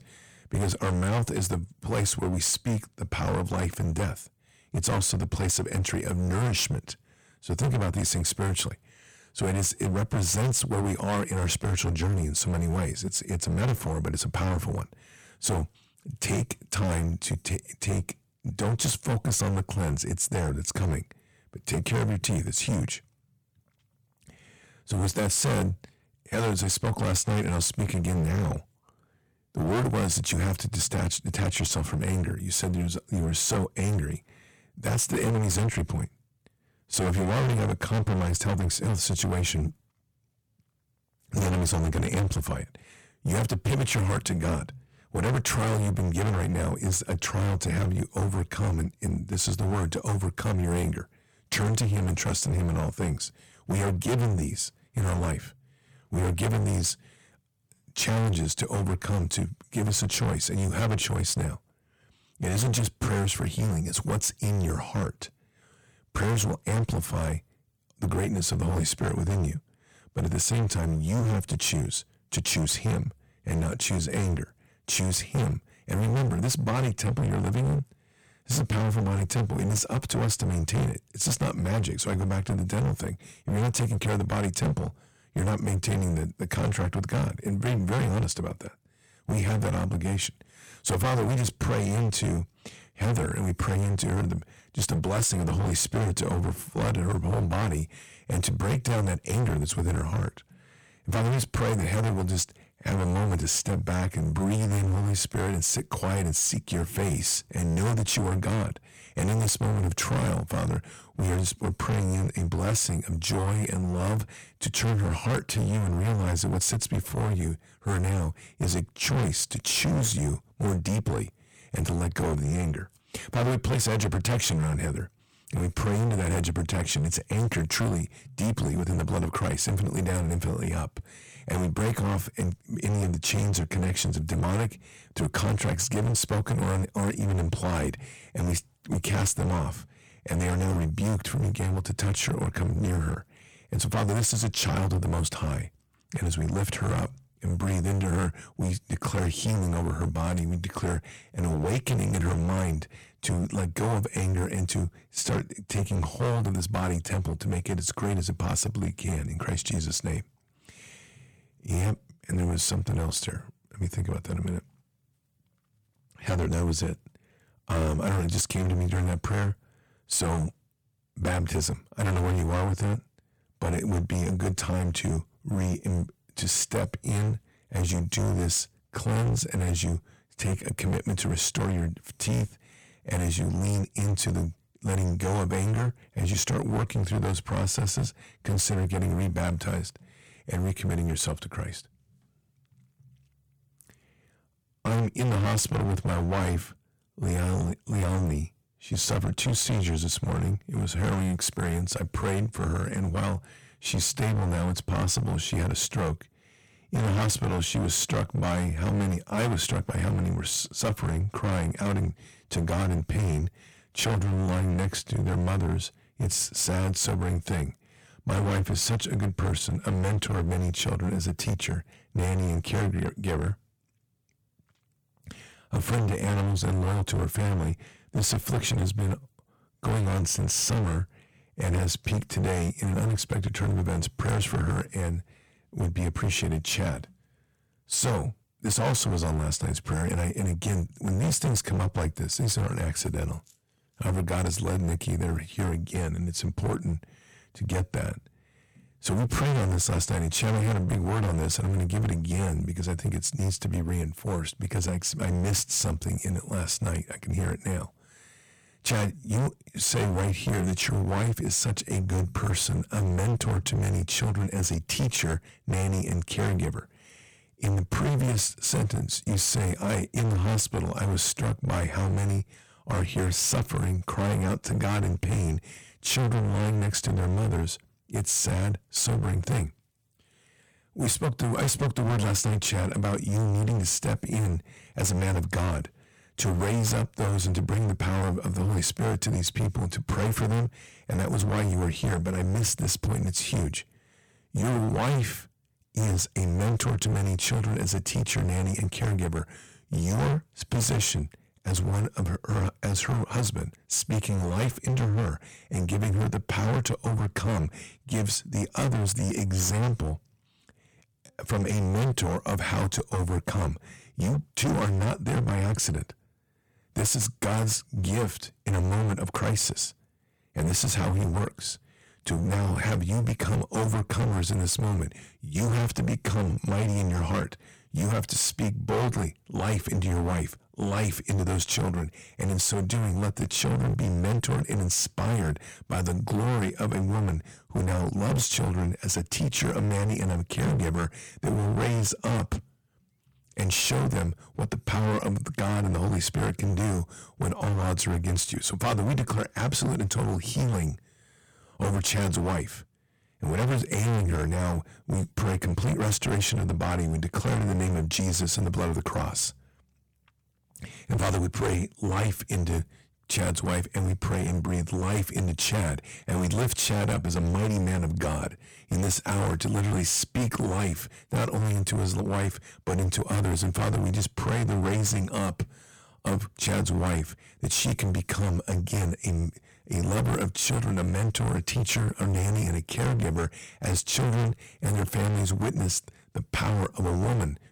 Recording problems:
distortion; heavy; 22% of the sound clipped

